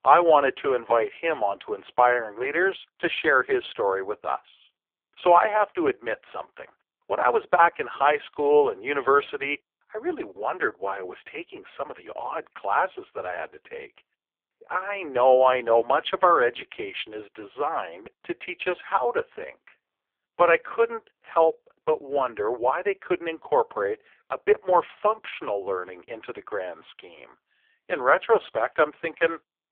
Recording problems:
phone-call audio; poor line; nothing above 3.5 kHz

